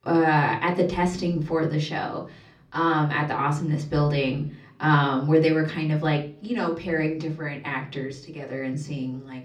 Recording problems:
off-mic speech; far
room echo; slight; dies away in 0.5 s

